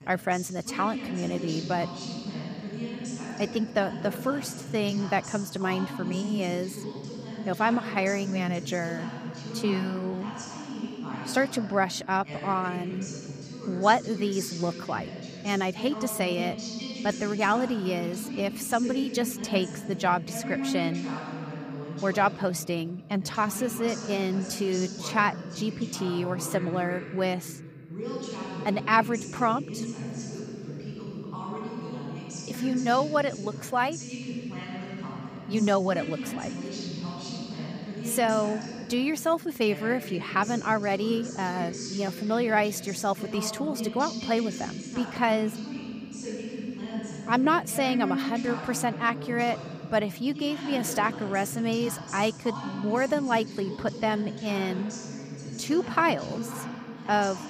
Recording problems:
voice in the background; loud; throughout; 8 dB below the speech

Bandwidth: 15 kHz